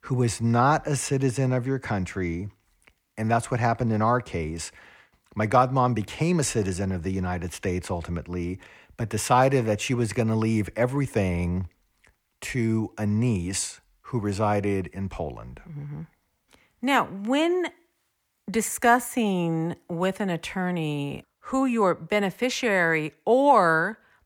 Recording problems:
none

